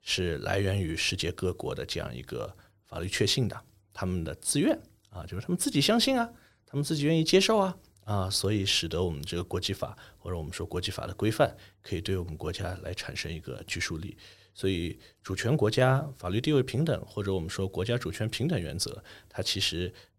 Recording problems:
none

